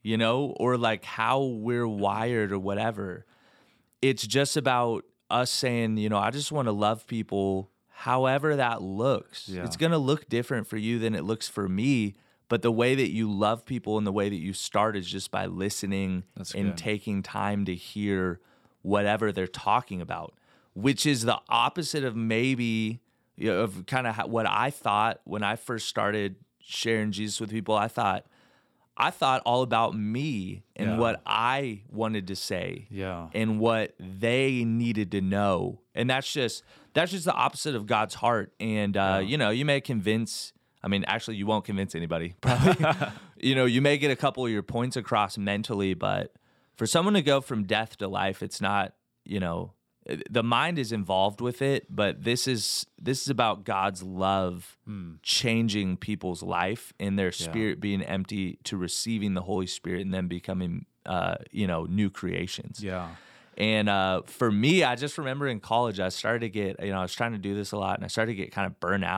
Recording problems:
abrupt cut into speech; at the end

